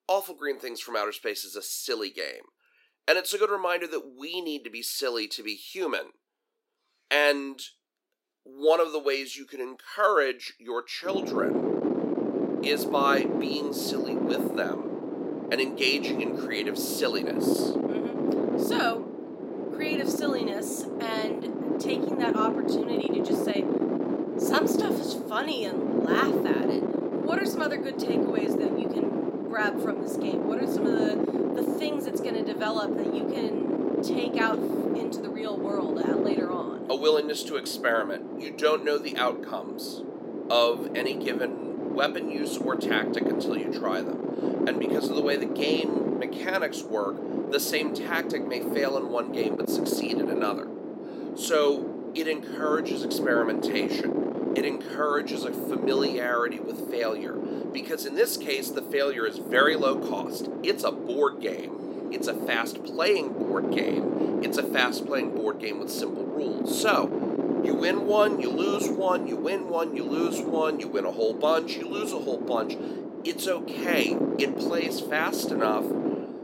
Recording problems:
thin; somewhat; fading below 300 Hz
wind noise on the microphone; heavy; from 11 s on; 4 dB below the speech

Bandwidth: 16 kHz